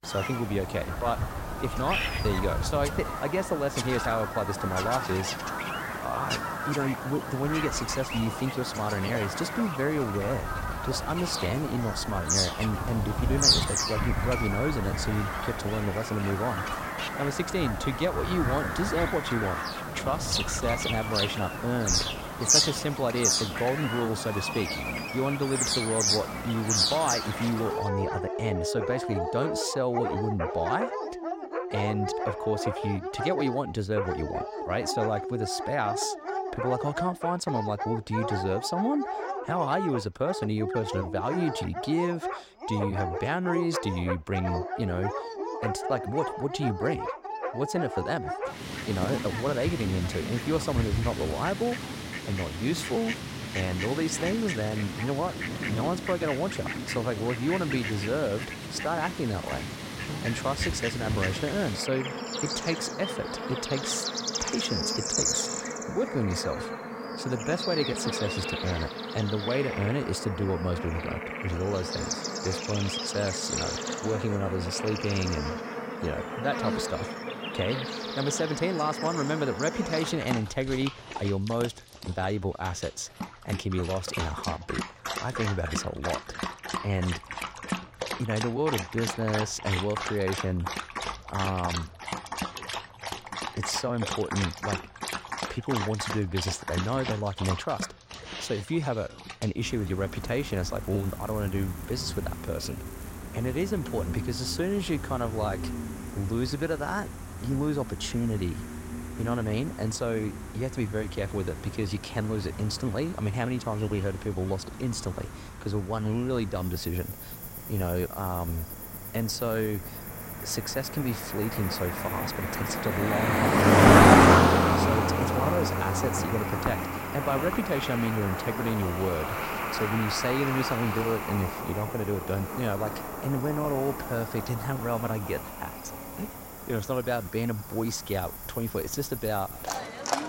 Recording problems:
animal sounds; very loud; throughout; as loud as the speech

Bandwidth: 16 kHz